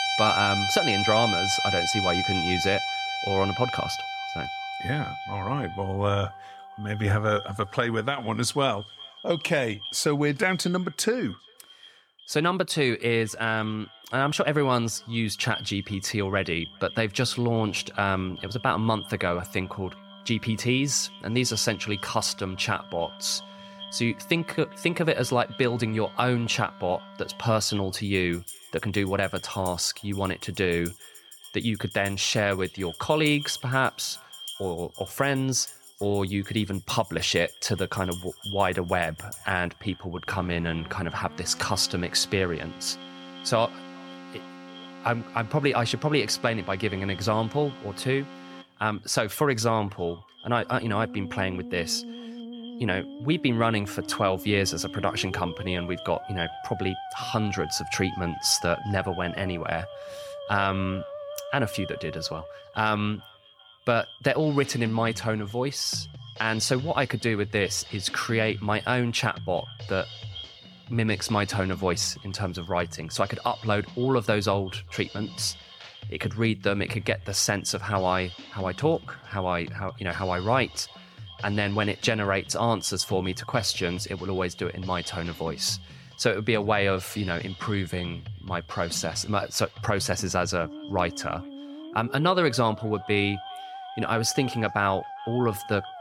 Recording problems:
echo of what is said; faint; throughout; 400 ms later, 20 dB below the speech
background music; loud; throughout; 10 dB below the speech

